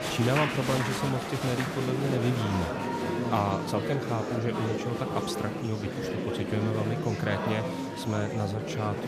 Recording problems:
murmuring crowd; loud; throughout; 1 dB below the speech

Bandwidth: 14.5 kHz